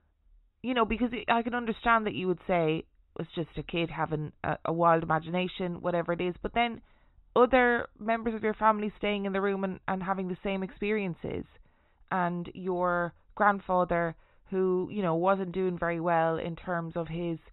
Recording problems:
high frequencies cut off; severe; nothing above 4 kHz

